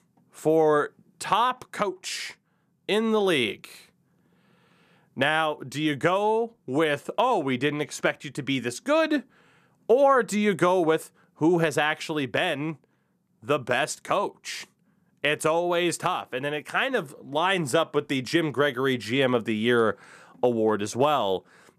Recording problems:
none

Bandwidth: 14.5 kHz